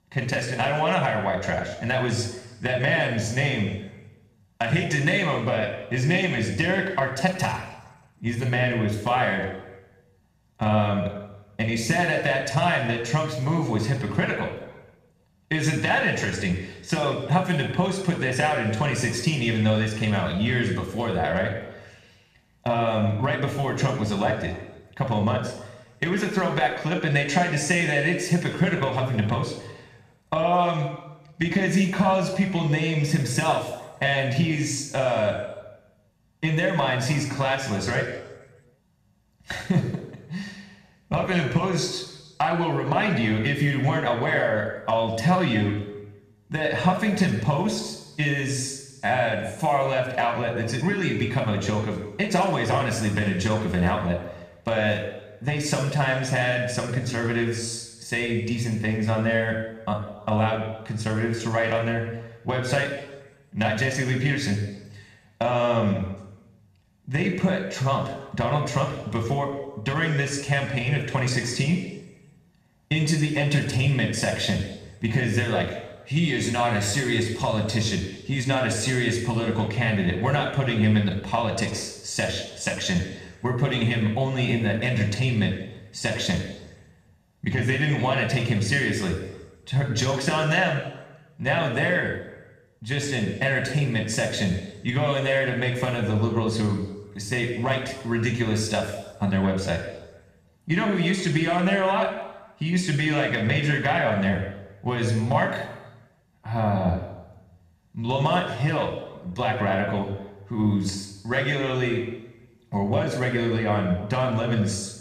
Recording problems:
room echo; noticeable; dies away in 1 s
off-mic speech; somewhat distant

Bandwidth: 14.5 kHz